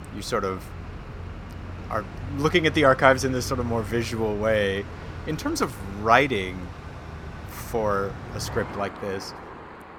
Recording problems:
traffic noise; noticeable; throughout; 15 dB below the speech

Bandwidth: 17 kHz